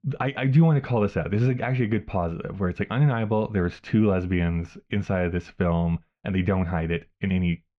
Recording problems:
muffled; very; fading above 3 kHz

